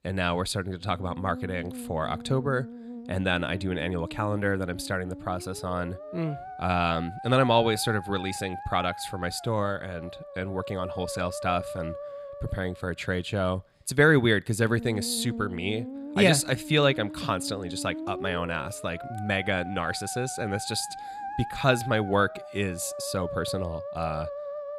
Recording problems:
background music; noticeable; throughout; 10 dB below the speech

